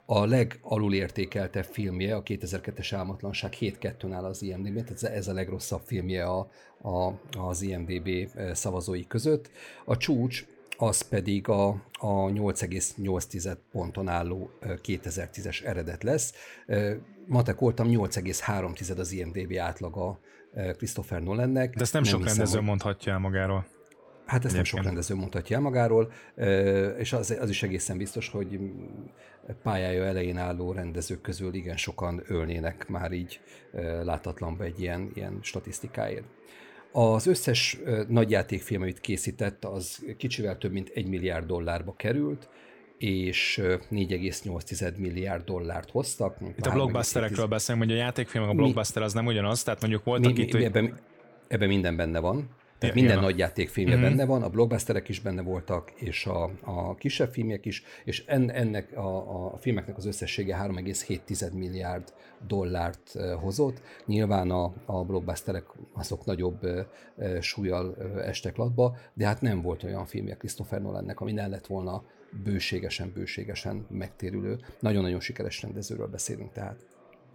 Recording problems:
chatter from many people; faint; throughout; 30 dB below the speech

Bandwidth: 17 kHz